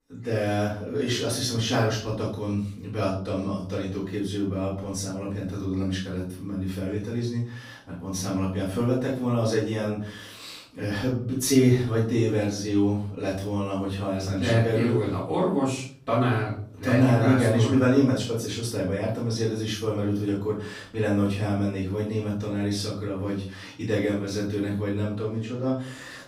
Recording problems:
off-mic speech; far
room echo; noticeable; dies away in 0.5 s

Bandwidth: 15.5 kHz